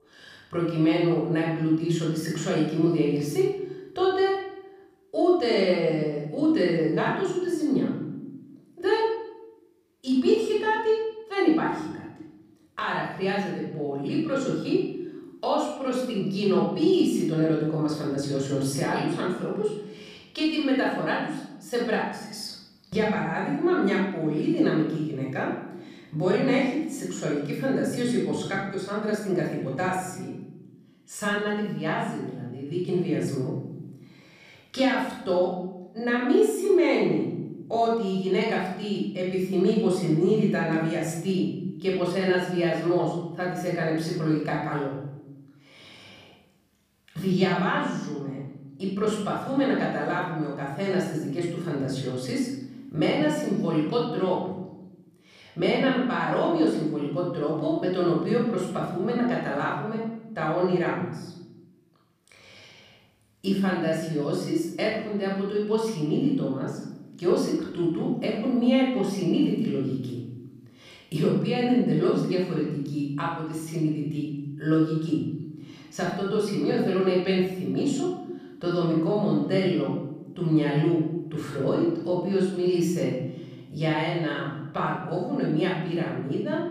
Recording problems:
off-mic speech; far
room echo; noticeable; dies away in 1 s

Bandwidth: 15 kHz